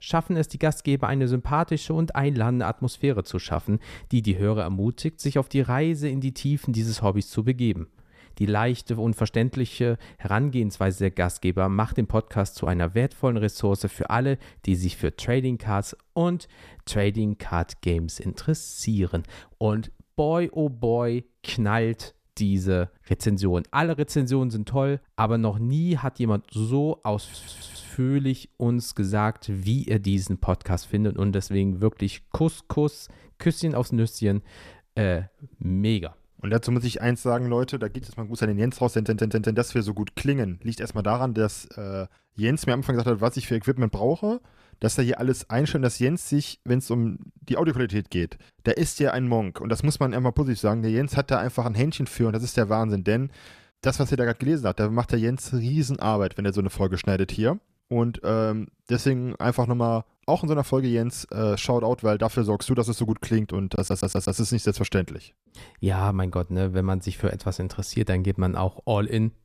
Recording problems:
audio stuttering; at 27 s, at 39 s and at 1:04

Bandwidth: 14.5 kHz